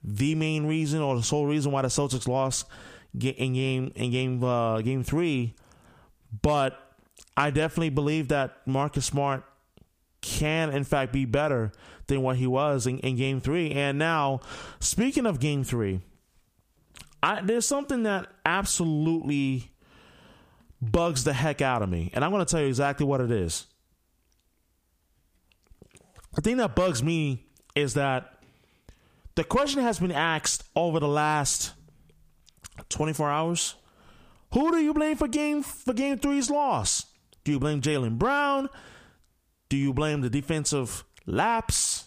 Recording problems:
squashed, flat; heavily

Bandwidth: 15 kHz